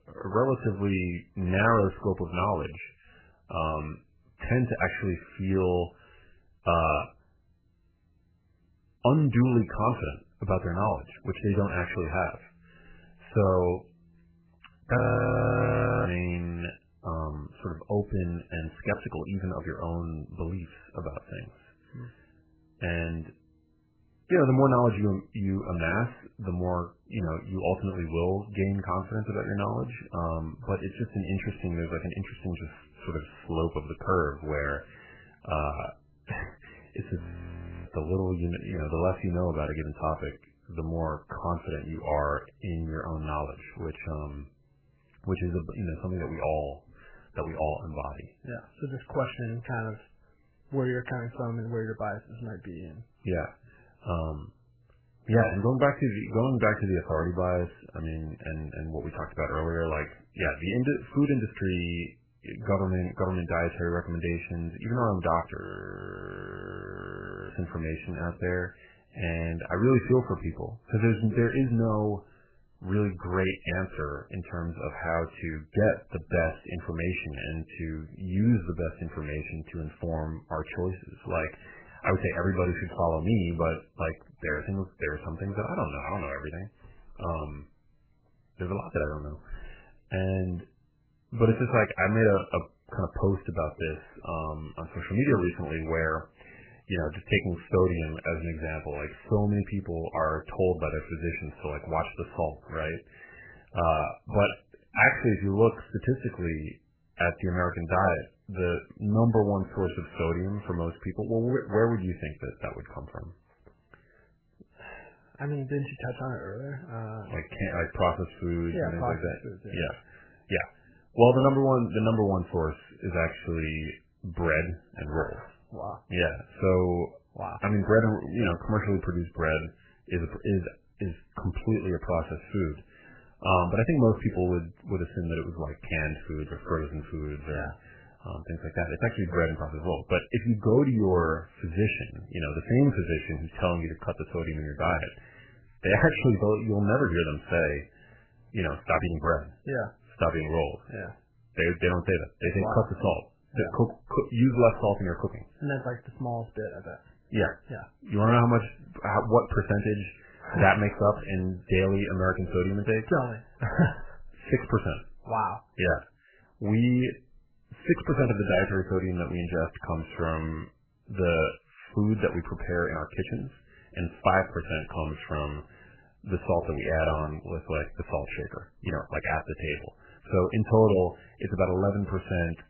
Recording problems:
garbled, watery; badly; nothing above 3 kHz
audio freezing; at 15 s for 1 s, at 37 s for 0.5 s and at 1:06 for 2 s

